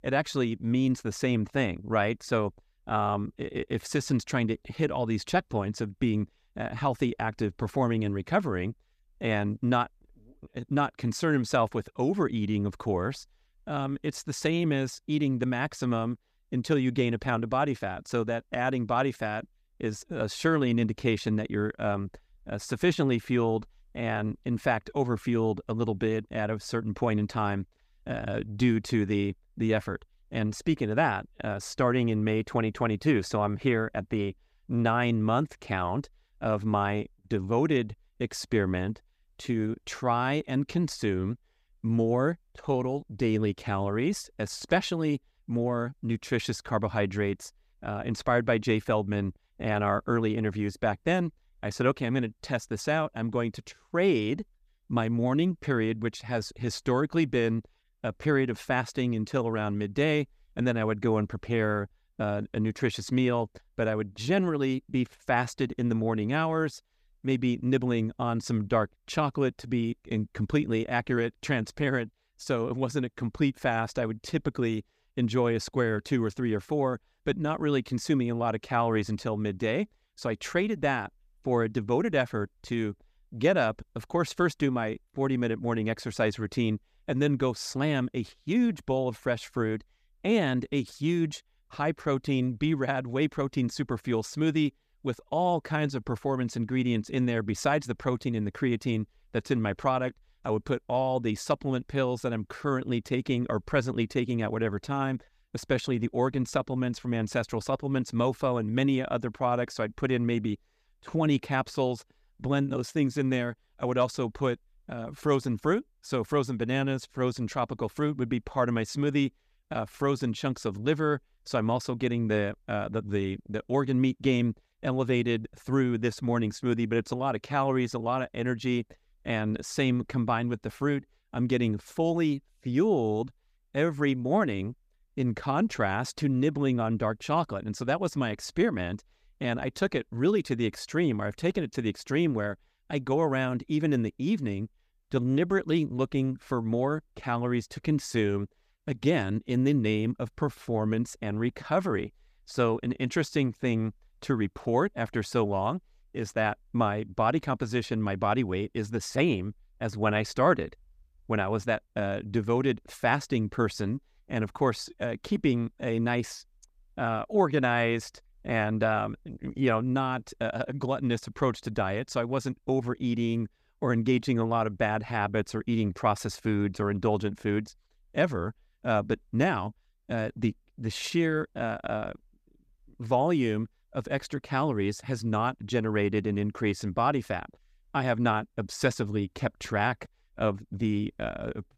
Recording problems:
none

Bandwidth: 14.5 kHz